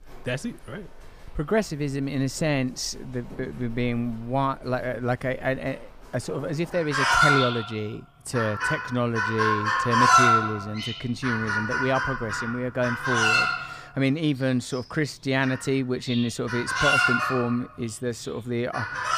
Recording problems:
animal sounds; very loud; throughout; 4 dB above the speech

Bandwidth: 15 kHz